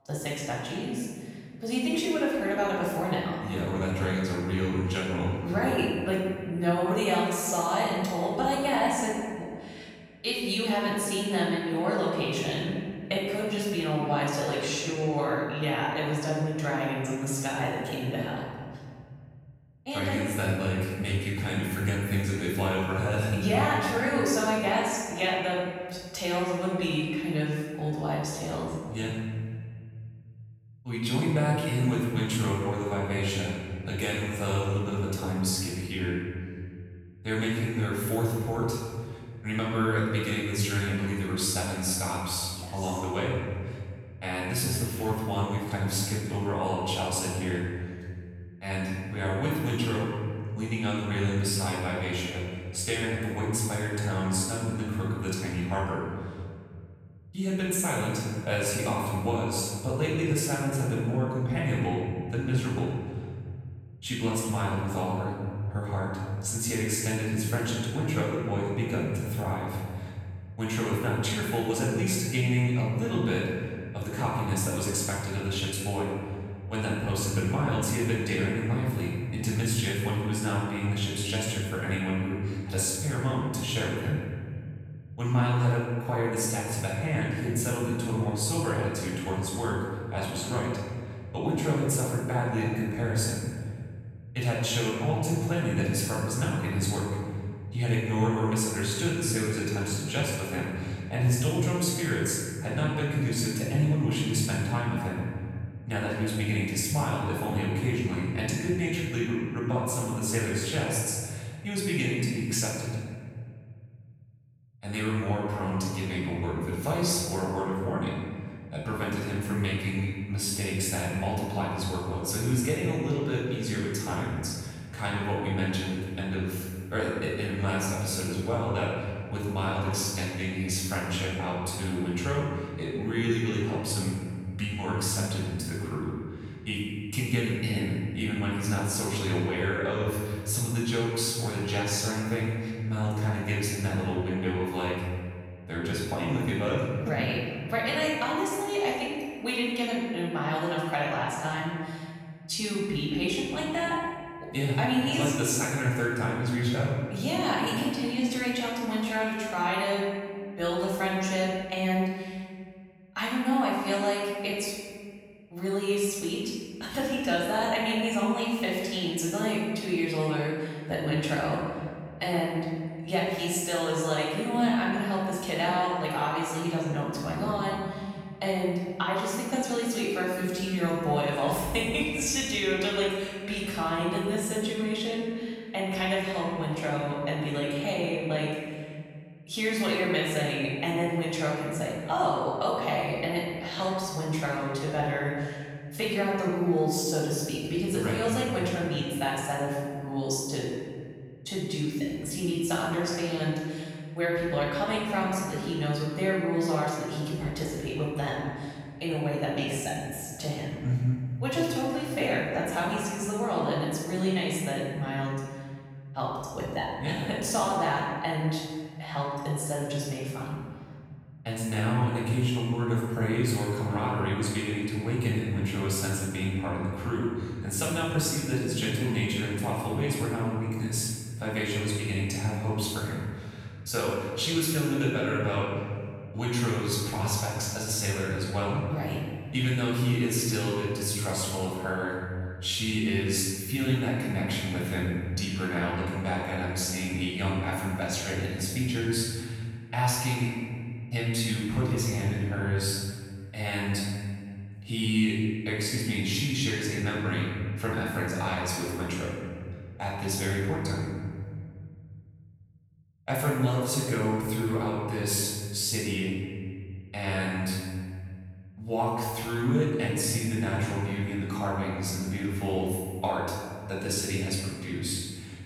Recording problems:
room echo; strong; dies away in 2.3 s
off-mic speech; far

